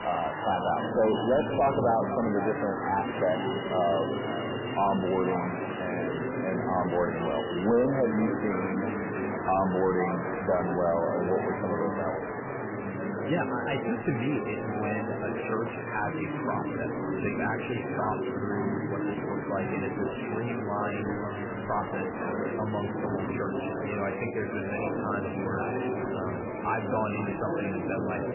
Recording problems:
garbled, watery; badly; nothing above 3 kHz
echo of what is said; noticeable; throughout; 500 ms later, 15 dB below the speech
distortion; slight; 10 dB below the speech
murmuring crowd; loud; throughout; 2 dB below the speech

